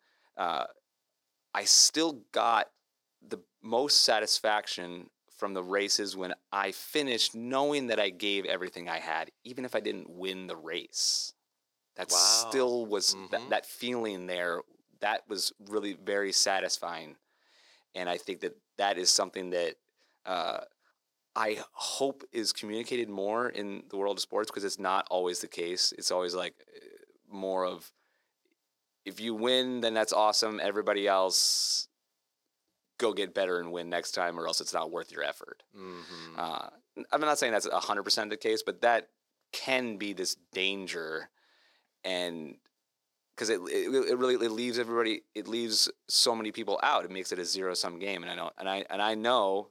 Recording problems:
thin; somewhat; fading below 350 Hz

